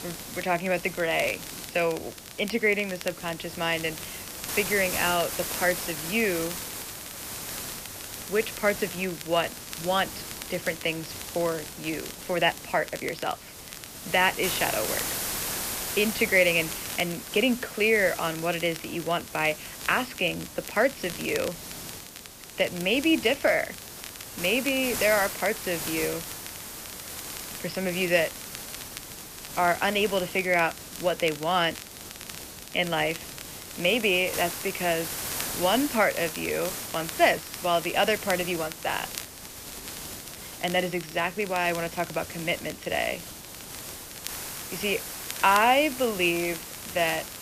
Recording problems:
high frequencies cut off; noticeable; nothing above 5.5 kHz
hiss; loud; throughout; 9 dB below the speech
crackle, like an old record; noticeable; 15 dB below the speech

